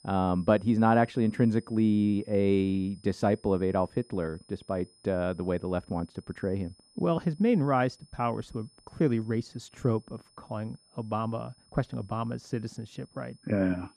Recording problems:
muffled; slightly; fading above 2 kHz
high-pitched whine; faint; throughout; 5 kHz, 30 dB below the speech

